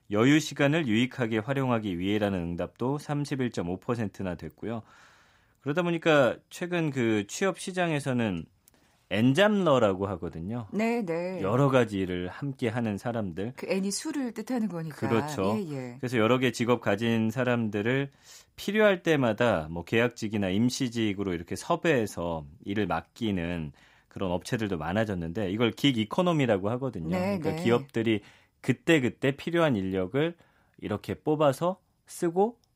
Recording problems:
none

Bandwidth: 15.5 kHz